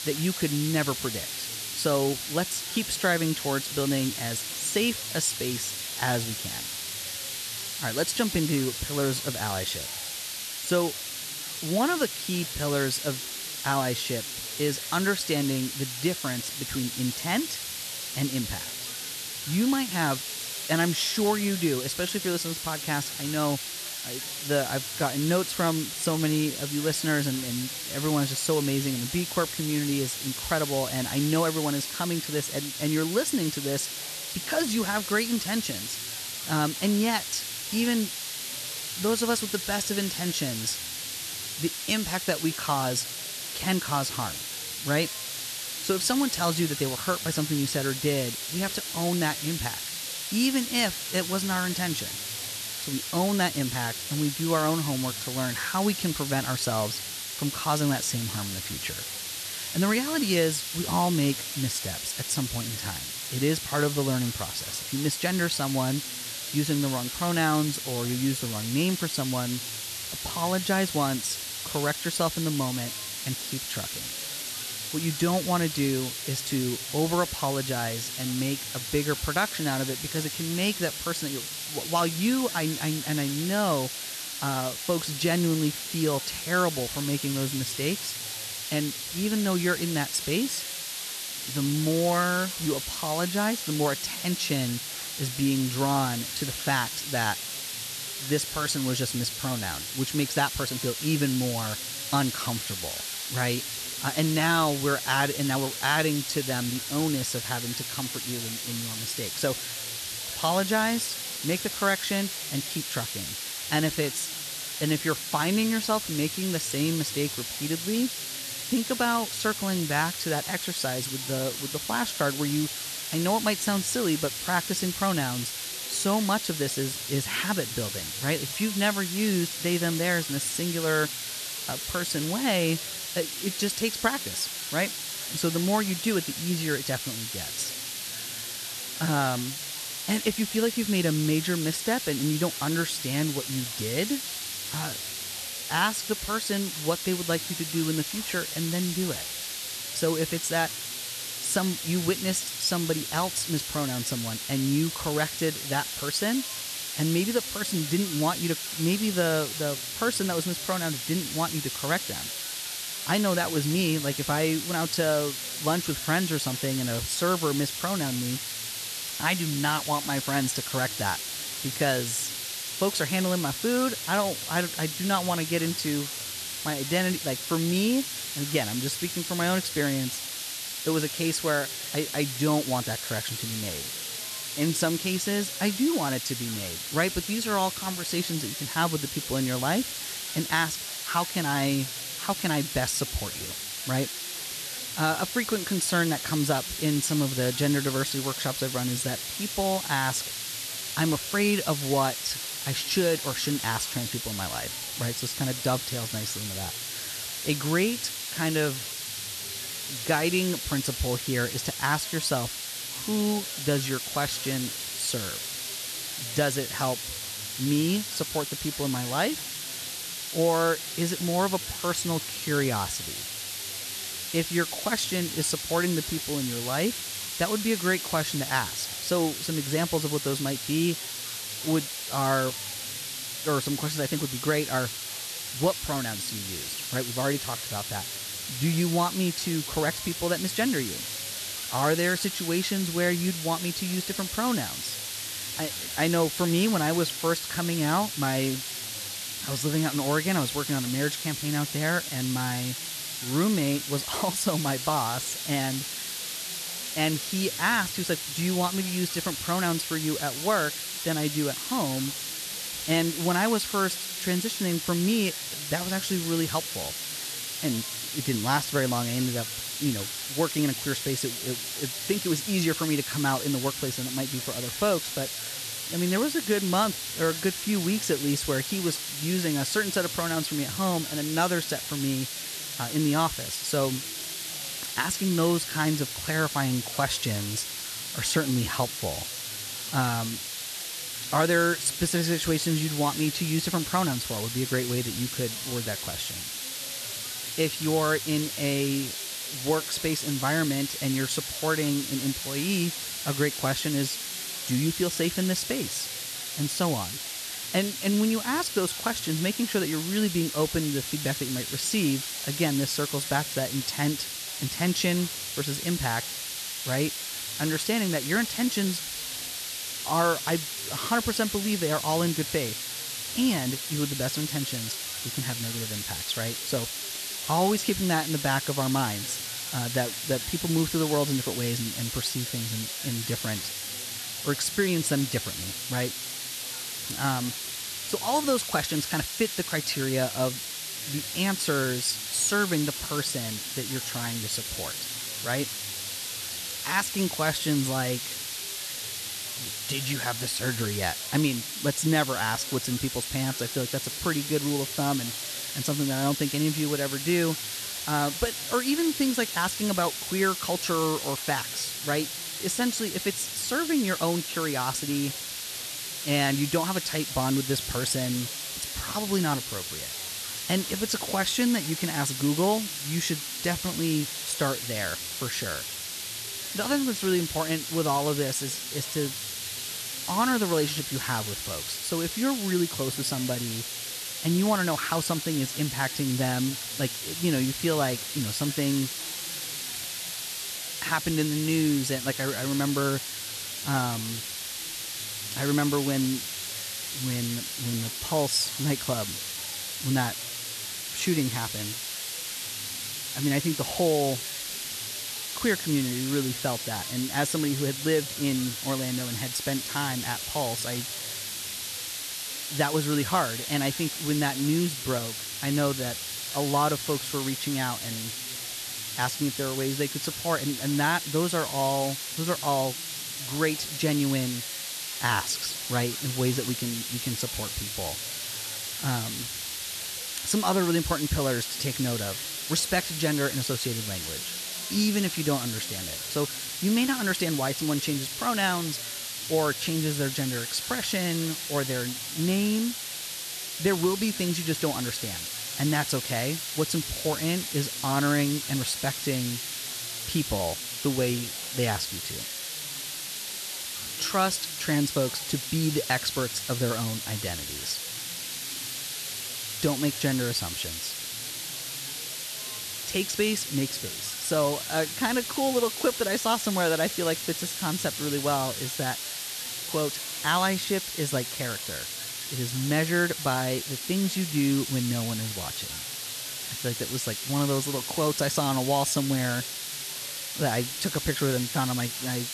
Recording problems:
hiss; loud; throughout; 3 dB below the speech
chatter from many people; faint; throughout; 25 dB below the speech

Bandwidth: 13.5 kHz